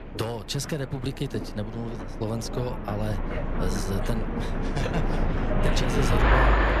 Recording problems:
train or aircraft noise; very loud; throughout; 4 dB above the speech
background chatter; faint; throughout; 3 voices, 25 dB below the speech

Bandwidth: 14 kHz